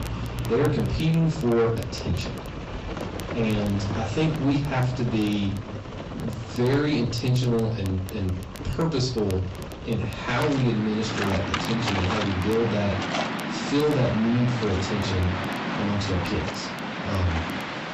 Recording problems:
off-mic speech; far
high frequencies cut off; noticeable; nothing above 8 kHz
distortion; slight; 10 dB below the speech
room echo; very slight; dies away in 0.3 s
garbled, watery; slightly
rain or running water; loud; throughout; 6 dB below the speech
crackle, like an old record; faint; 25 dB below the speech

